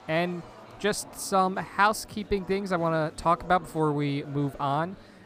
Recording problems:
murmuring crowd; faint; throughout; 20 dB below the speech

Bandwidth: 15 kHz